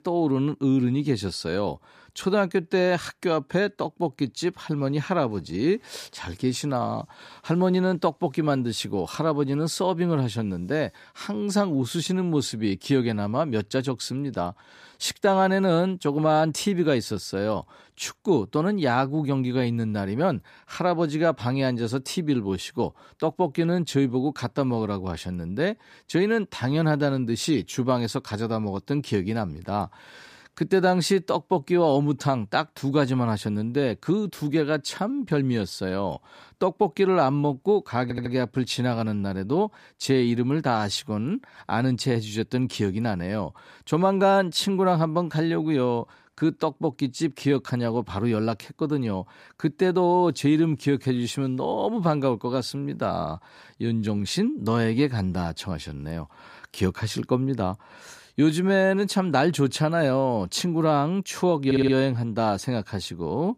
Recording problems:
audio stuttering; at 38 s and at 1:02

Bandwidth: 14.5 kHz